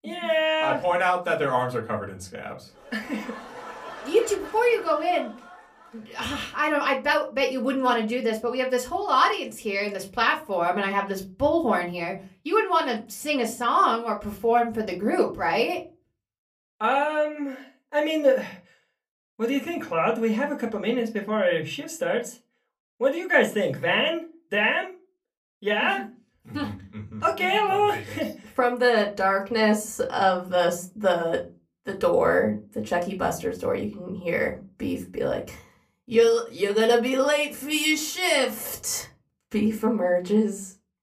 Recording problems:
off-mic speech; far
room echo; very slight; dies away in 0.2 s

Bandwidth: 15 kHz